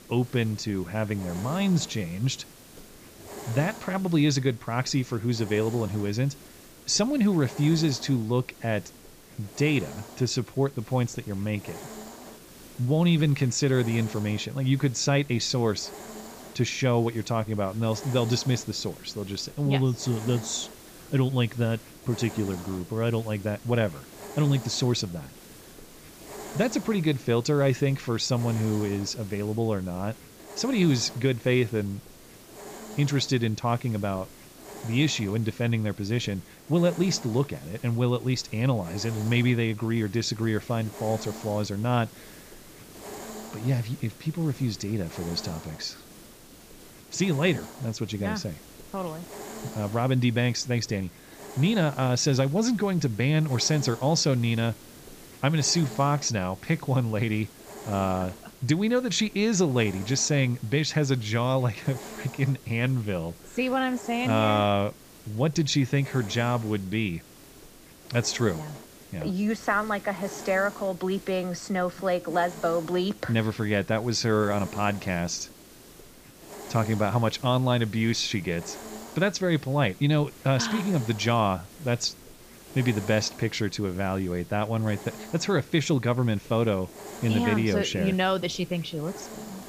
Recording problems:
high frequencies cut off; noticeable; nothing above 8 kHz
hiss; noticeable; throughout; 15 dB below the speech

